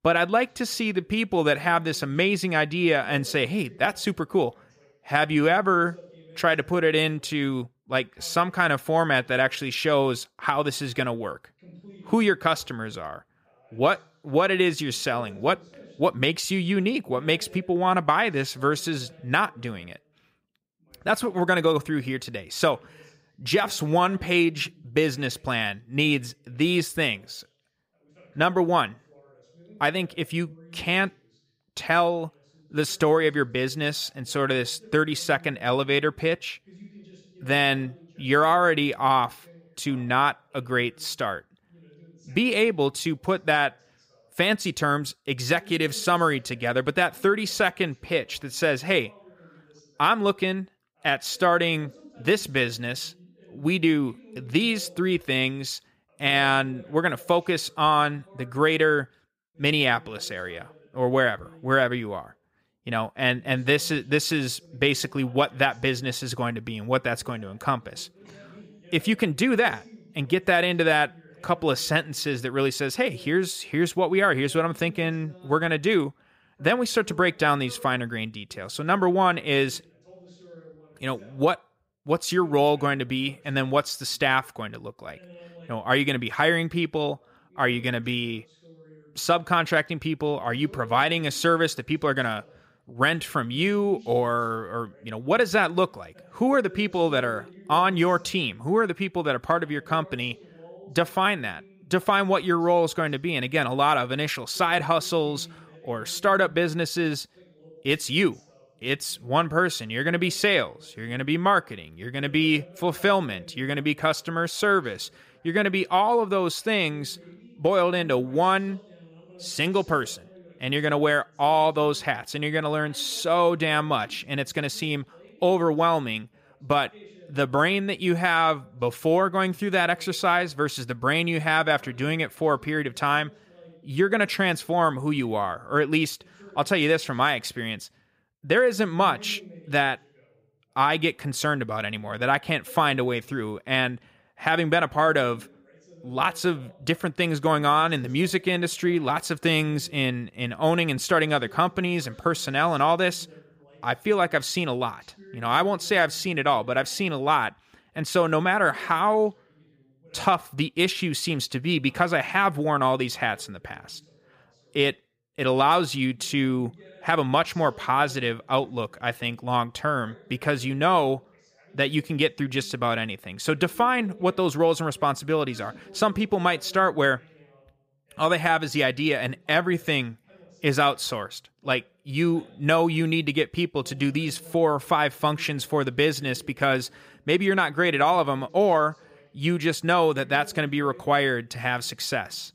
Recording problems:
voice in the background; faint; throughout; 25 dB below the speech

